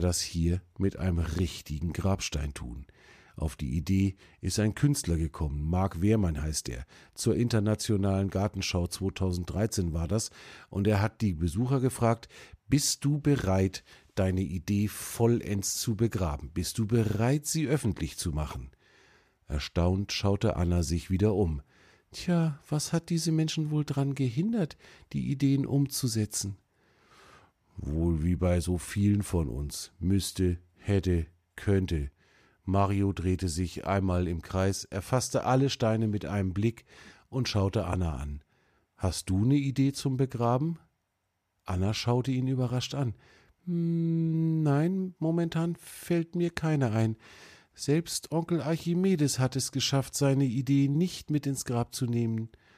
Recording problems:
abrupt cut into speech; at the start

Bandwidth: 14.5 kHz